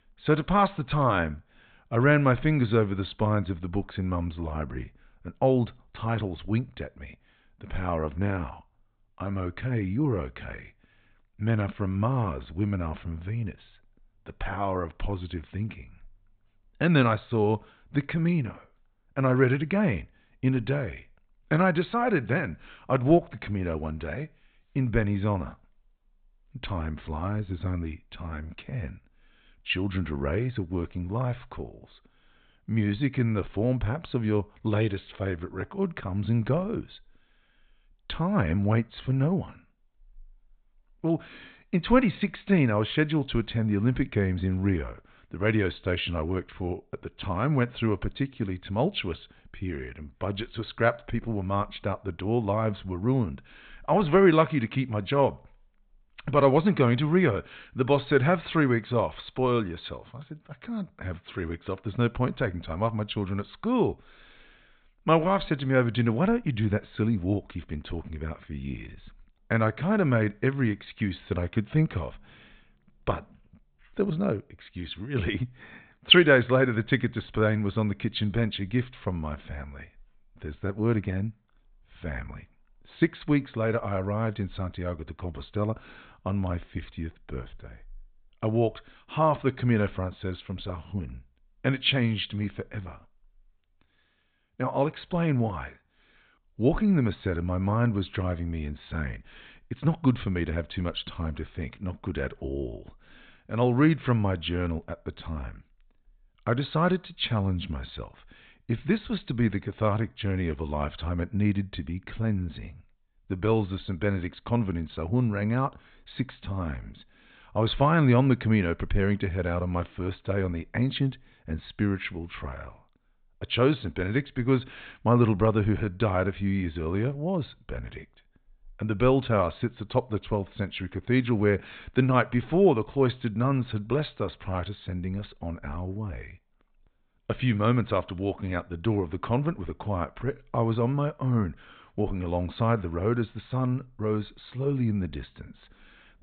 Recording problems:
high frequencies cut off; severe; nothing above 4 kHz

